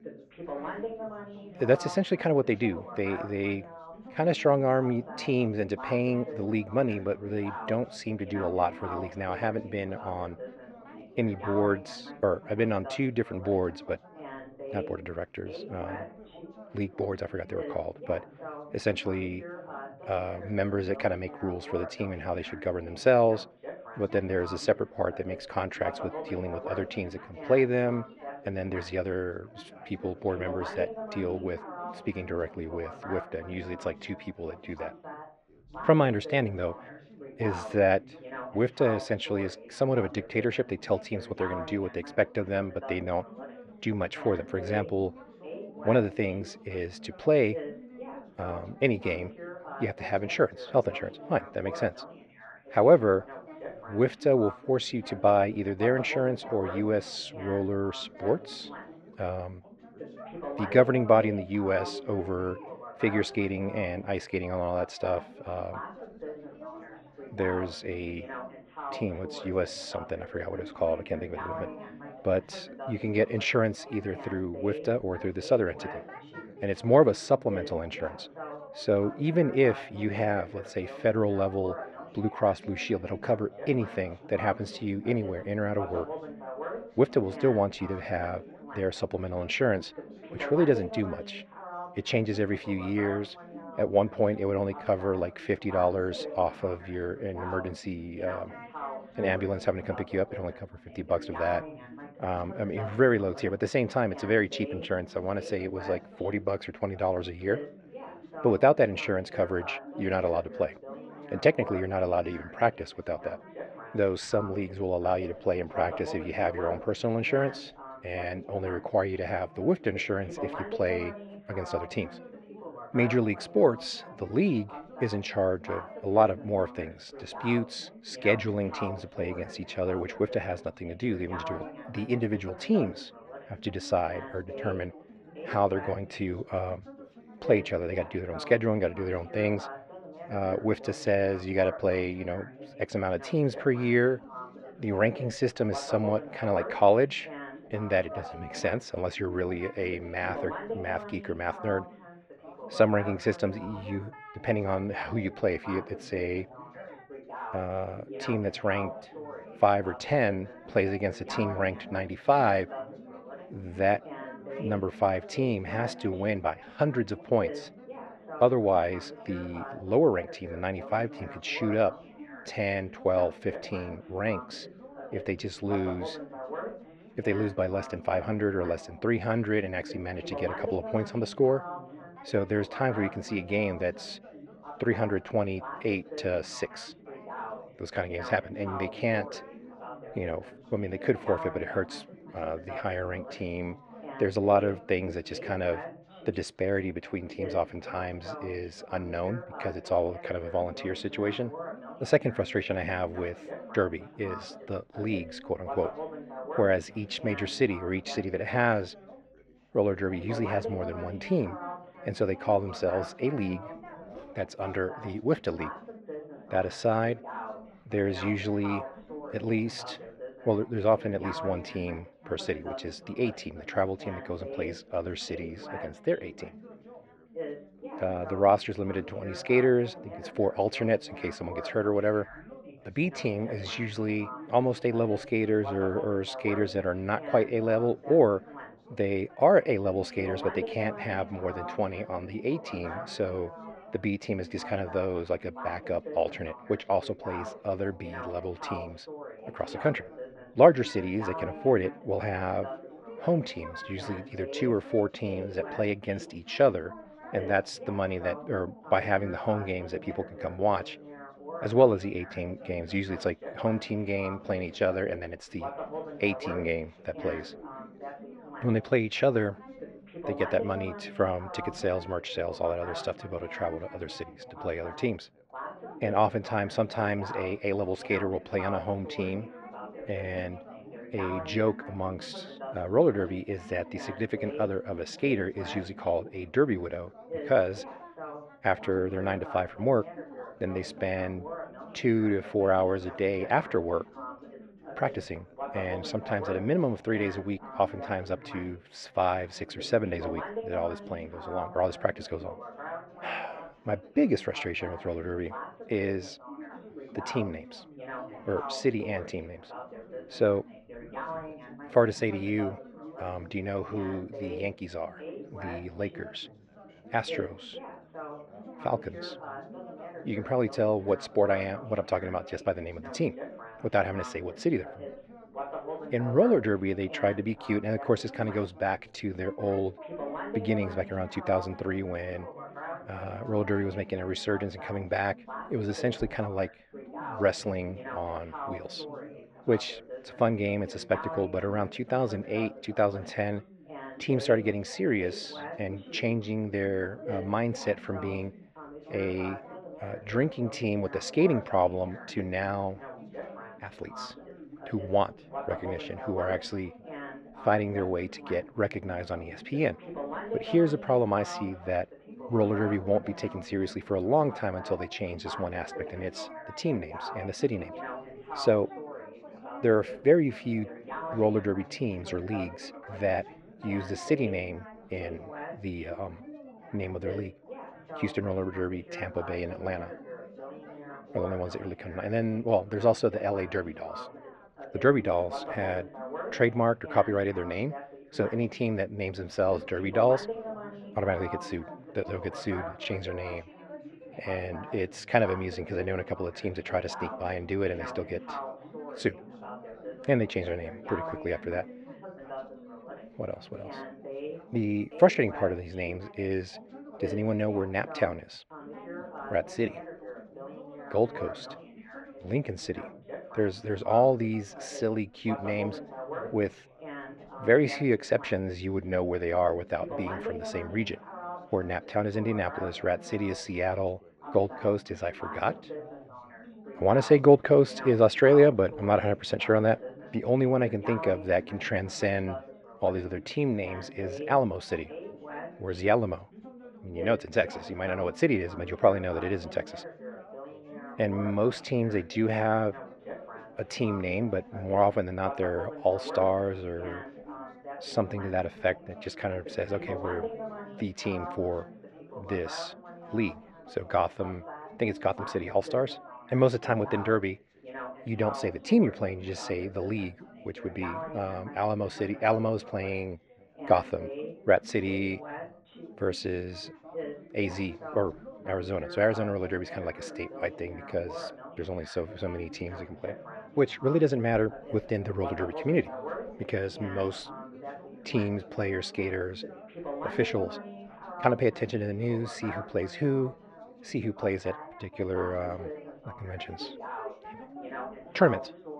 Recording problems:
muffled; very; fading above 2.5 kHz
background chatter; noticeable; throughout; 4 voices, 15 dB below the speech

